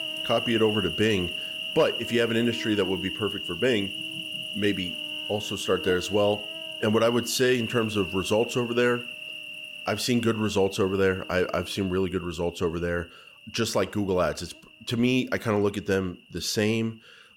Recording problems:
animal sounds; loud; throughout; 6 dB below the speech

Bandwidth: 16.5 kHz